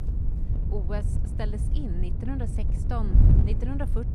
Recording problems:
wind noise on the microphone; heavy; 2 dB below the speech
footsteps; faint; at the start; peak 15 dB below the speech

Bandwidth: 14.5 kHz